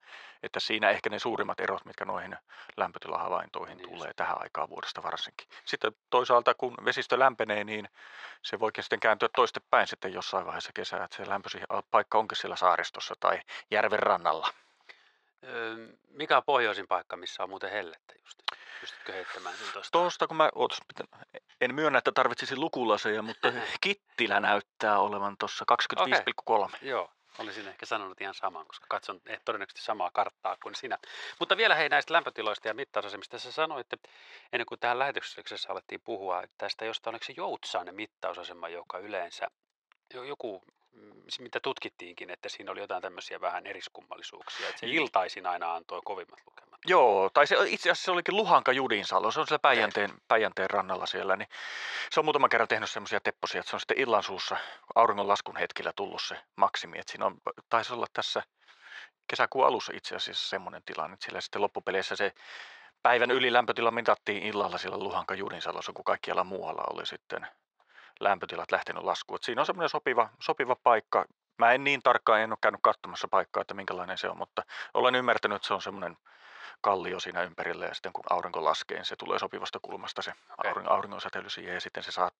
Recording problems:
thin; very; fading below 650 Hz
muffled; very slightly; fading above 2.5 kHz

